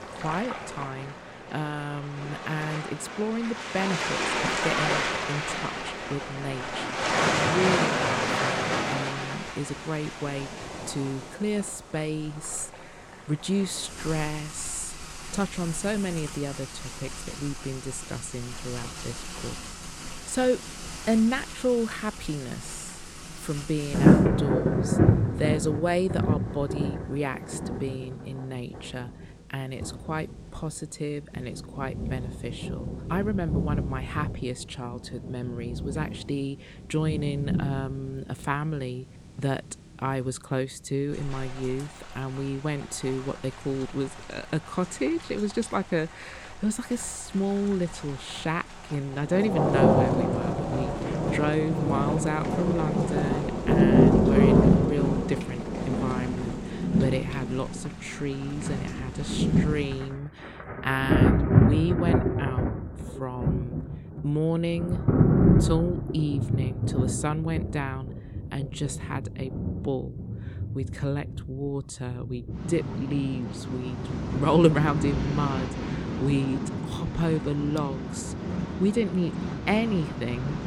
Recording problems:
rain or running water; very loud; throughout; 3 dB above the speech

